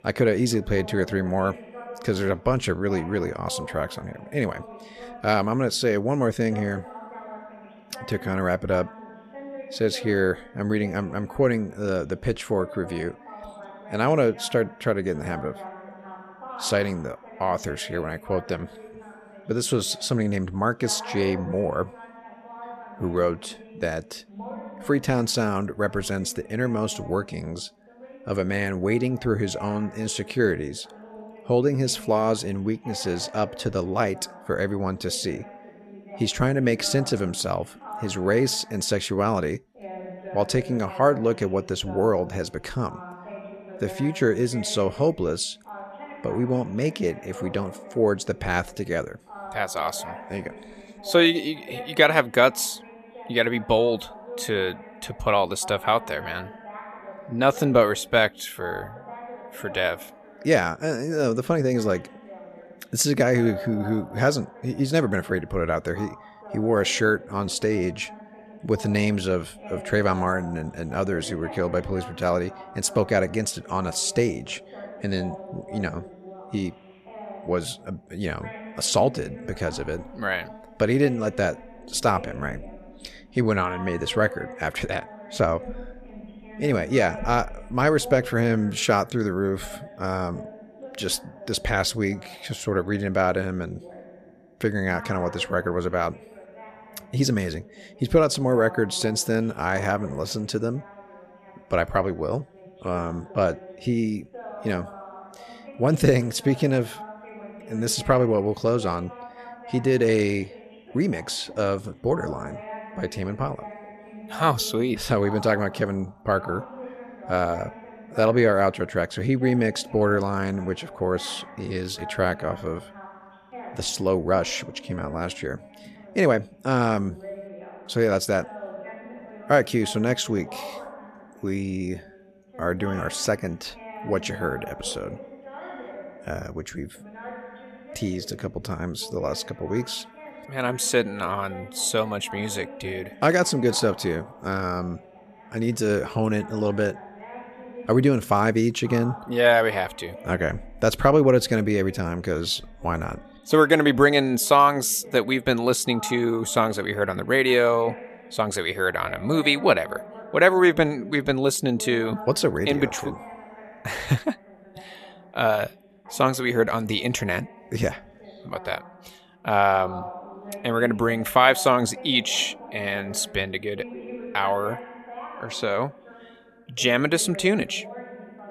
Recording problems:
voice in the background; noticeable; throughout; 15 dB below the speech

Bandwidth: 14 kHz